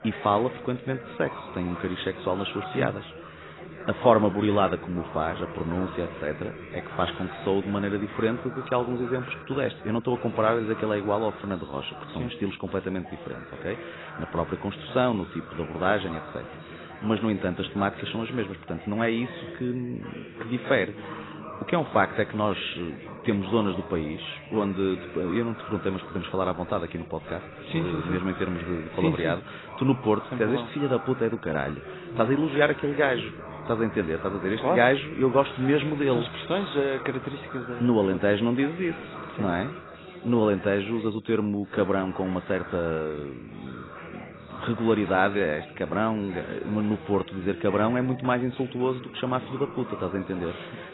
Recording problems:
garbled, watery; badly; nothing above 4 kHz
background chatter; noticeable; throughout; 3 voices, 15 dB below the speech

